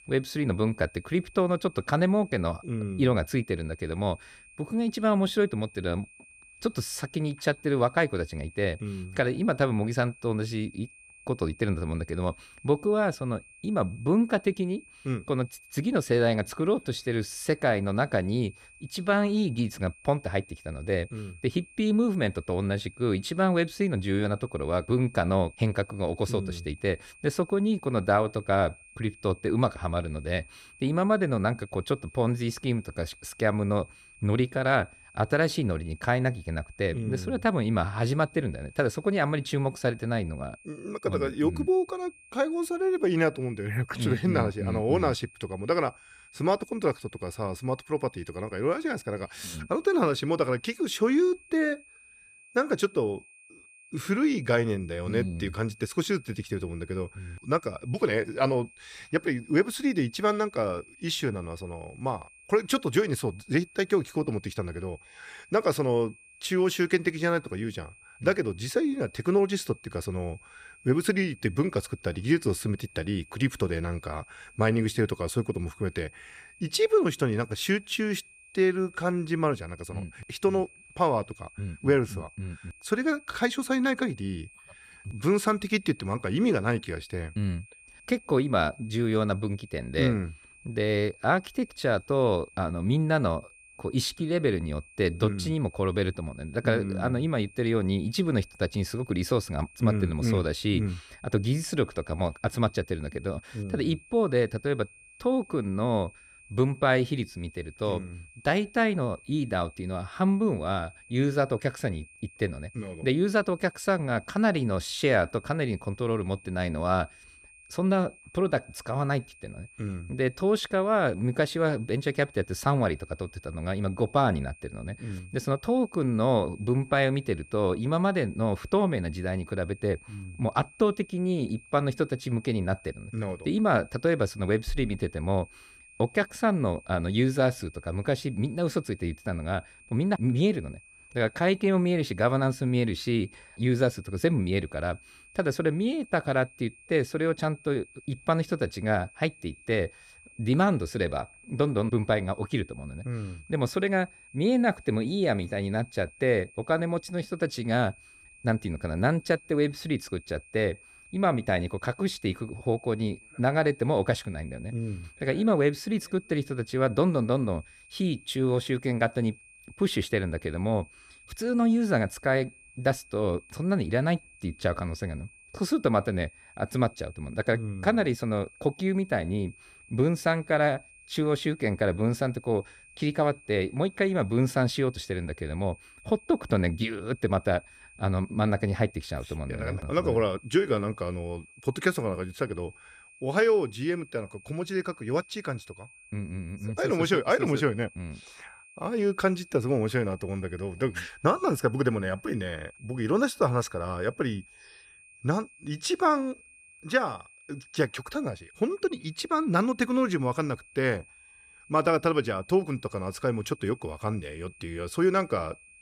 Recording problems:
high-pitched whine; faint; throughout; 2.5 kHz, 25 dB below the speech

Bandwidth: 14.5 kHz